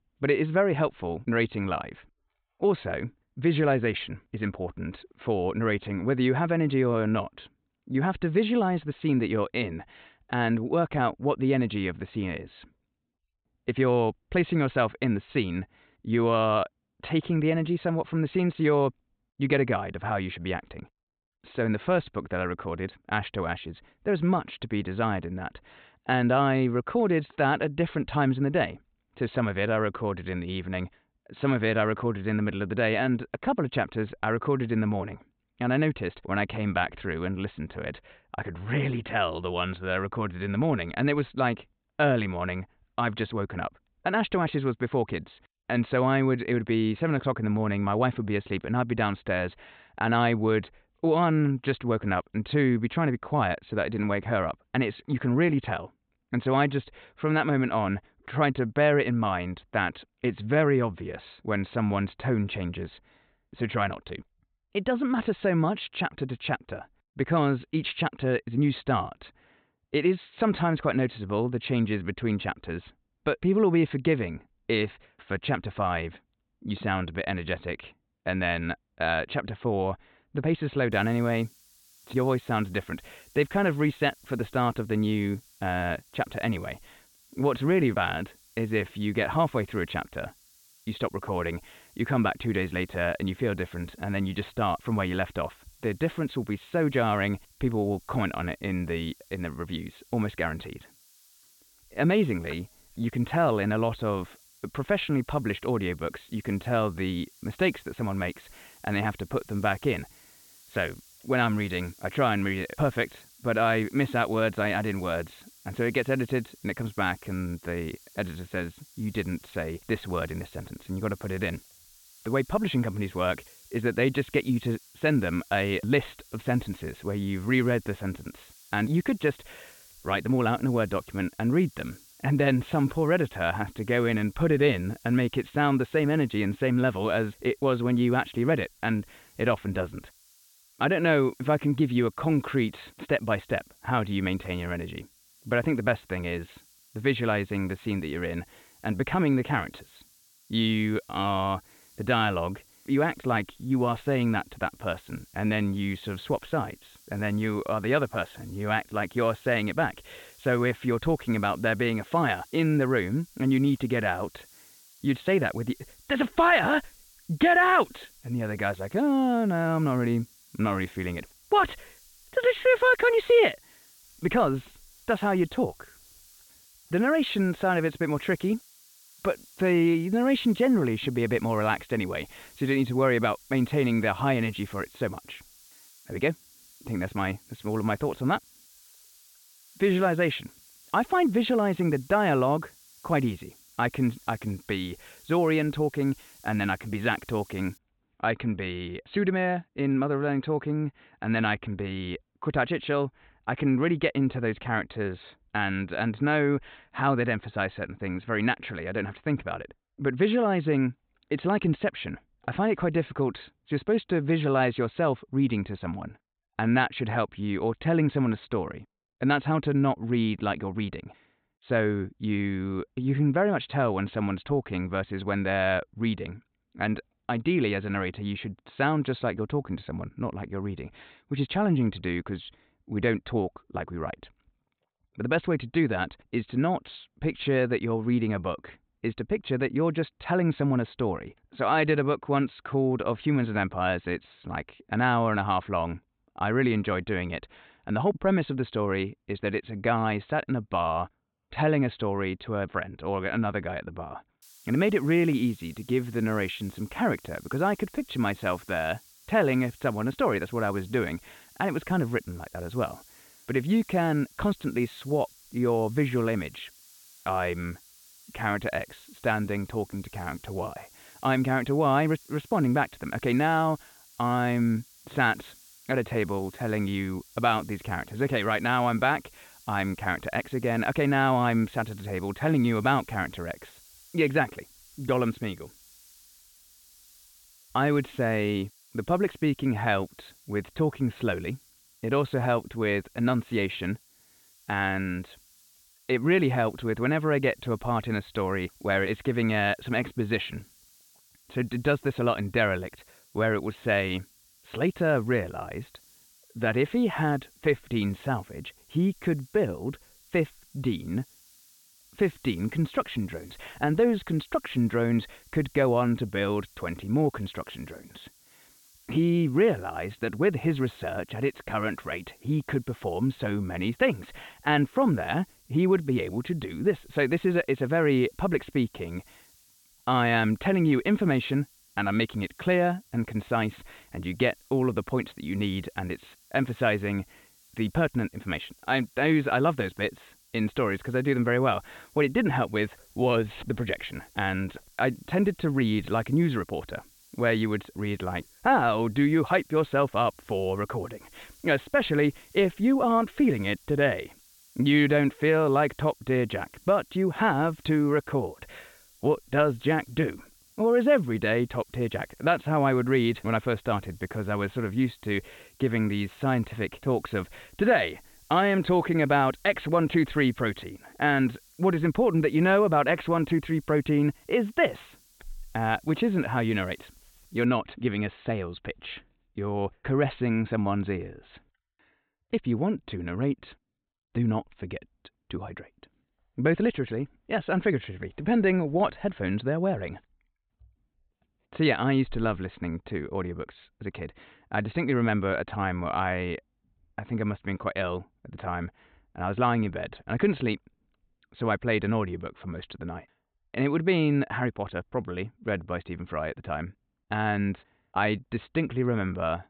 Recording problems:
high frequencies cut off; severe; nothing above 4 kHz
hiss; faint; from 1:21 to 3:18 and from 4:14 to 6:18; 25 dB below the speech

